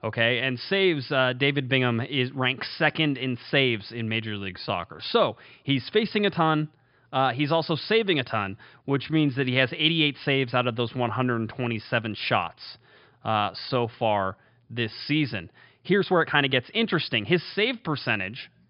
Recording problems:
high frequencies cut off; noticeable; nothing above 5 kHz
uneven, jittery; strongly; from 4.5 to 17 s

